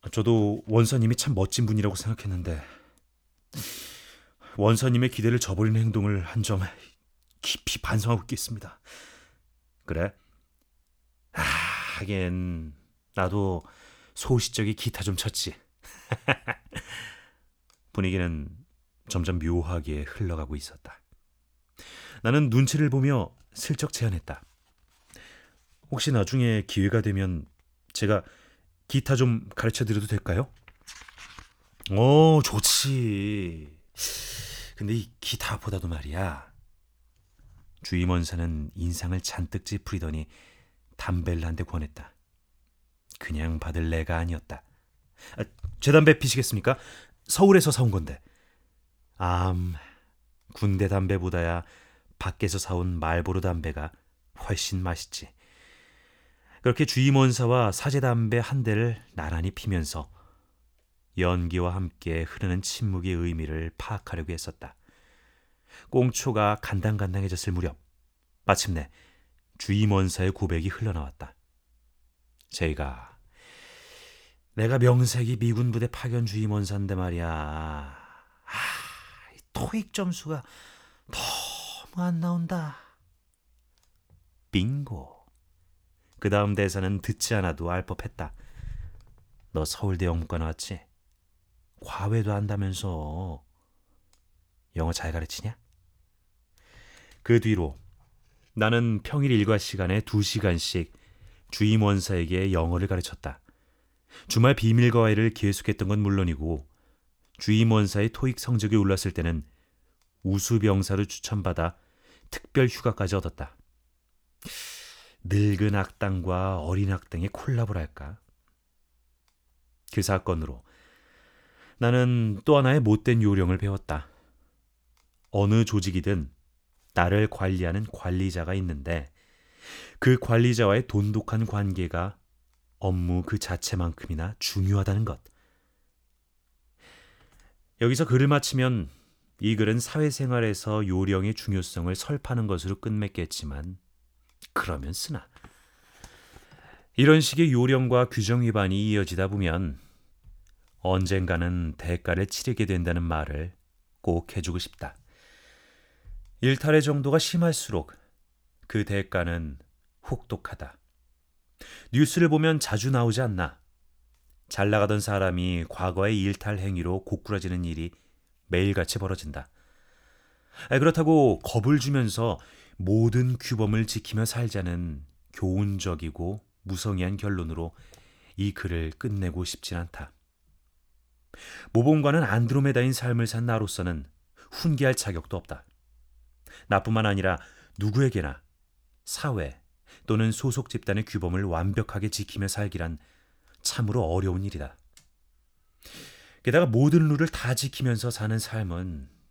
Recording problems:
none

